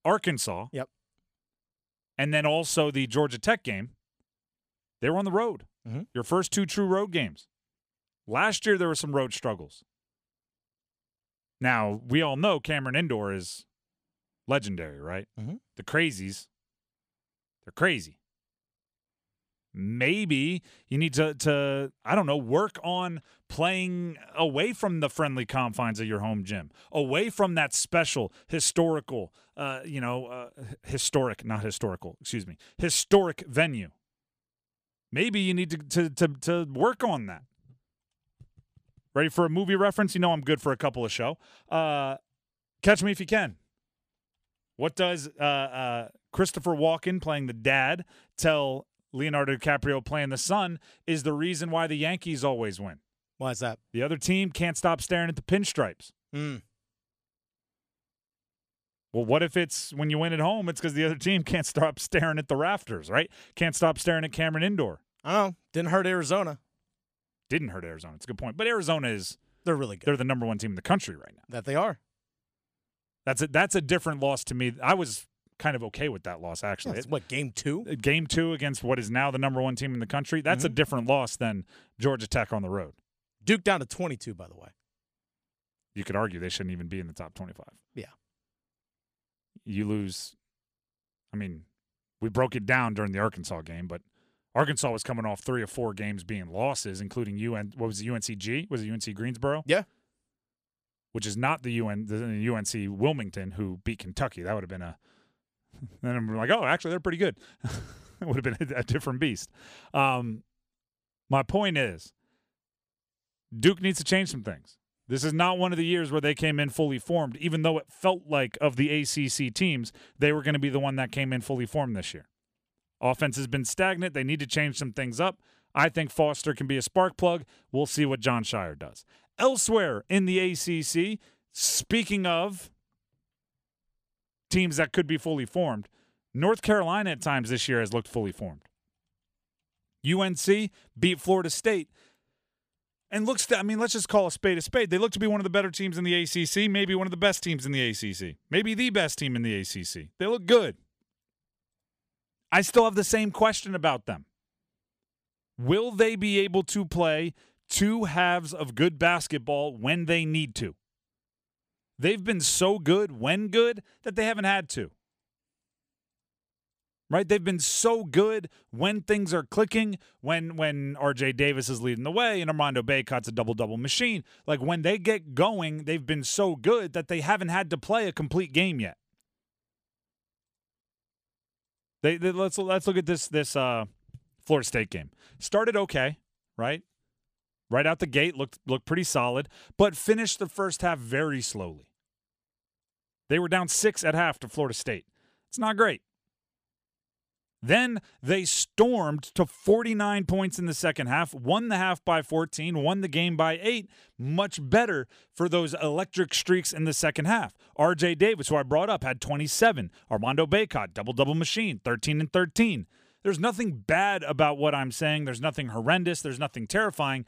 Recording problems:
none

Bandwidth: 14.5 kHz